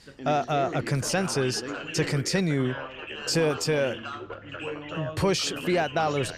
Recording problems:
background chatter; loud; throughout; 4 voices, 9 dB below the speech

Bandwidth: 14 kHz